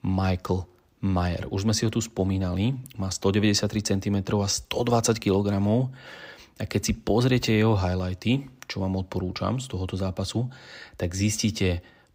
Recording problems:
none

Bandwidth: 15.5 kHz